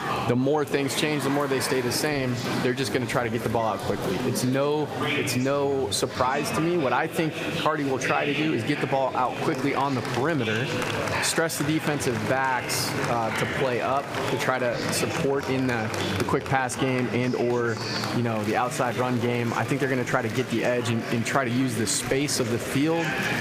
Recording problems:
echo of what is said; faint; throughout; 240 ms later, 20 dB below the speech
squashed, flat; somewhat, background pumping
chatter from many people; loud; throughout; 5 dB below the speech

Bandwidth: 15 kHz